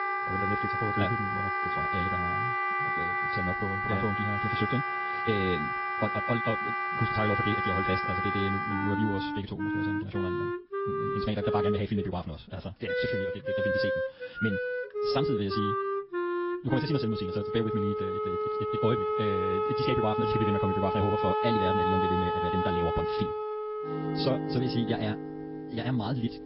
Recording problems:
wrong speed, natural pitch; too fast; 1.7 times normal speed
high frequencies cut off; noticeable; nothing above 5.5 kHz
garbled, watery; slightly
background music; very loud; throughout; 3 dB above the speech

